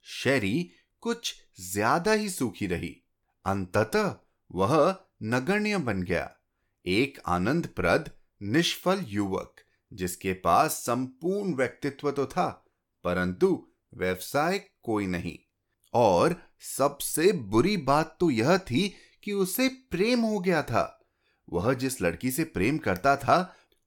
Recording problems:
none

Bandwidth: 17.5 kHz